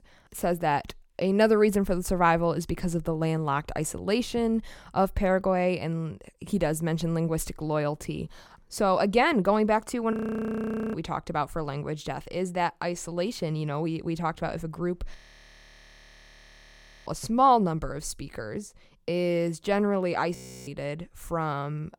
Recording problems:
audio freezing; at 10 s for 1 s, at 15 s for 2 s and at 20 s

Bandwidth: 17.5 kHz